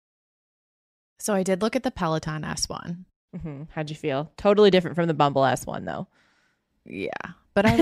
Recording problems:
abrupt cut into speech; at the end

